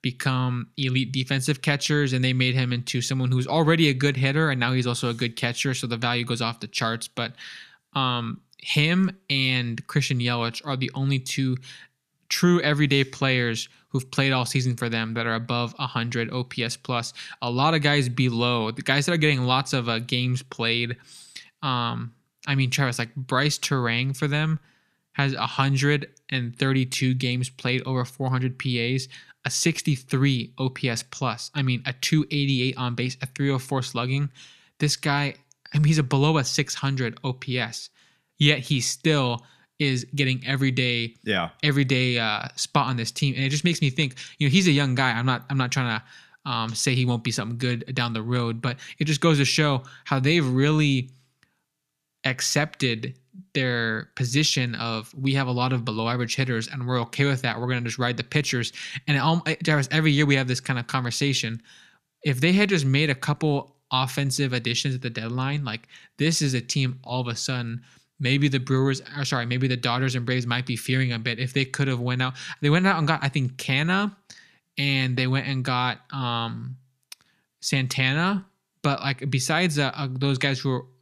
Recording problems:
none

